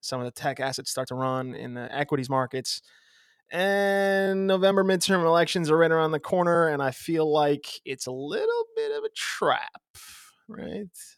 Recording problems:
uneven, jittery; strongly; from 0.5 to 11 s

